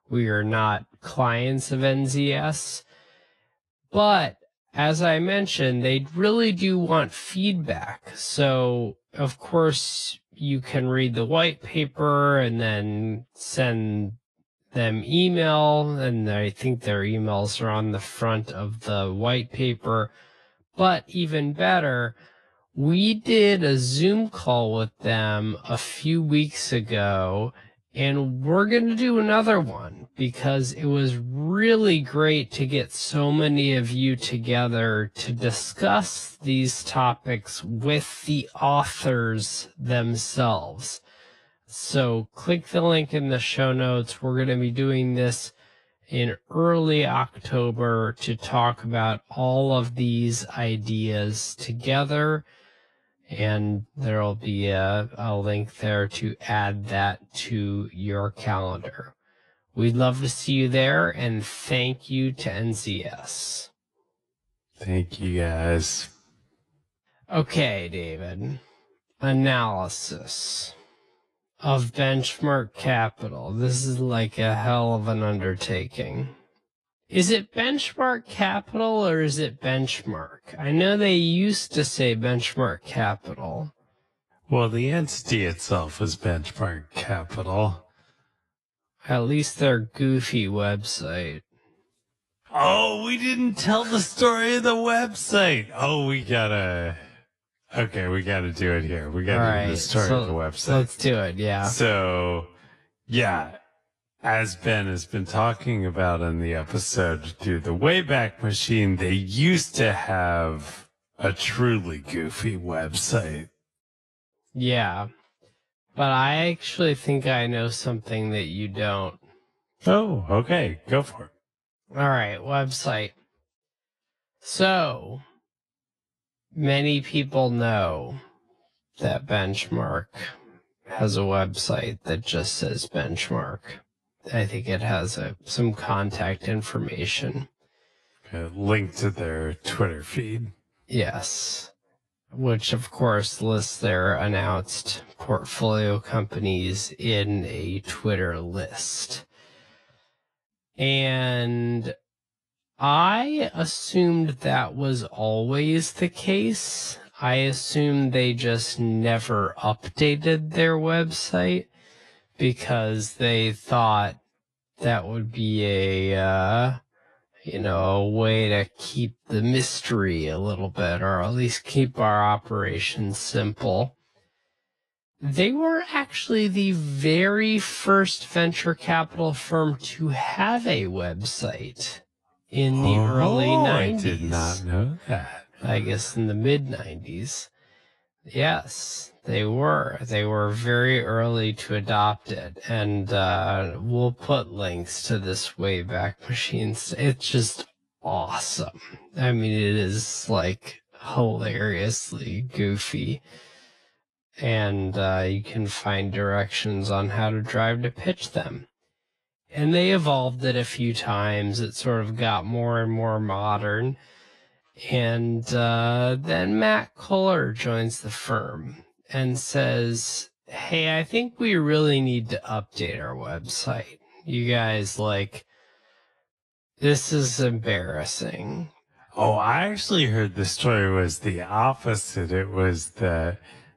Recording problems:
wrong speed, natural pitch; too slow; 0.5 times normal speed
garbled, watery; slightly

